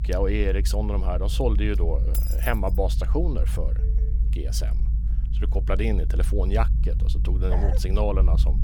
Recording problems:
low rumble; noticeable; throughout; 15 dB below the speech
jangling keys; noticeable; at 2 s; peak 3 dB below the speech
phone ringing; faint; at 4 s; peak 15 dB below the speech
dog barking; noticeable; at 7.5 s; peak 7 dB below the speech

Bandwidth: 18 kHz